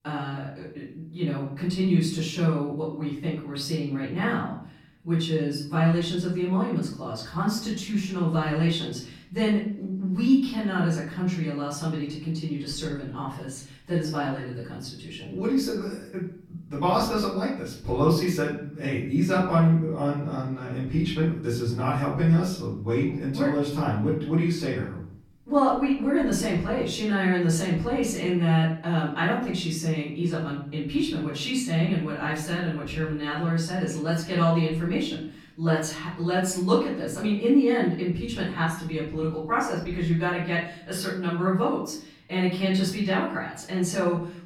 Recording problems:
off-mic speech; far
room echo; noticeable; dies away in 0.6 s

